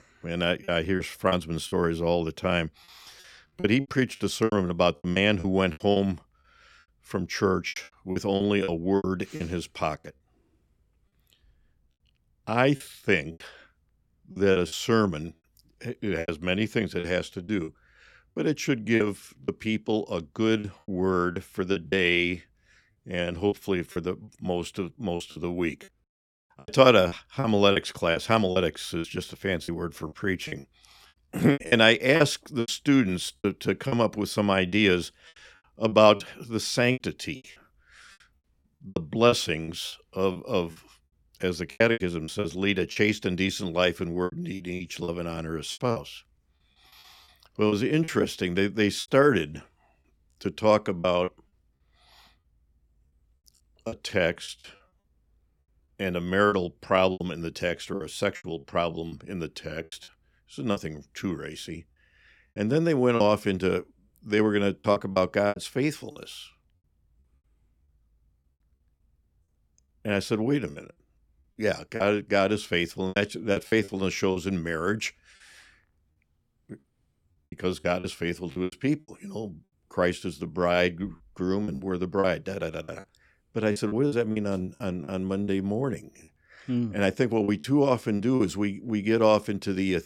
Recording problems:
choppy; very; 10% of the speech affected

